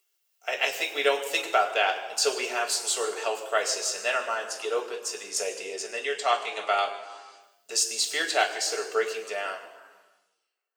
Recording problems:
thin; very; fading below 400 Hz
room echo; slight; dies away in 1.1 s
off-mic speech; somewhat distant

